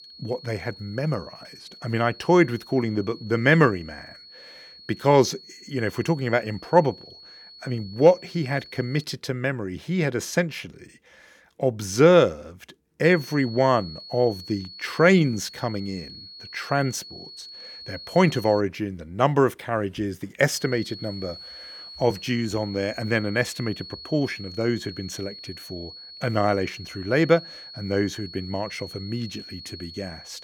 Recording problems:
high-pitched whine; noticeable; until 9 s, from 13 to 19 s and from 21 s on; 4.5 kHz, 15 dB below the speech

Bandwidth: 18 kHz